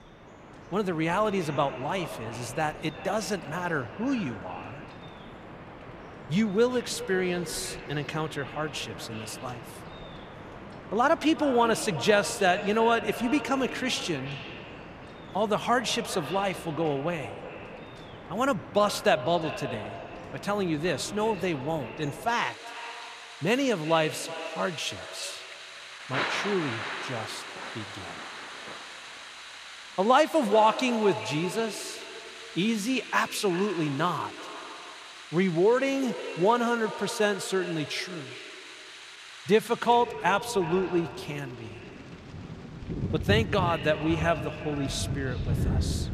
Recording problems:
echo of what is said; noticeable; throughout; 360 ms later, 15 dB below the speech
rain or running water; noticeable; throughout; 10 dB below the speech

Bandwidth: 14.5 kHz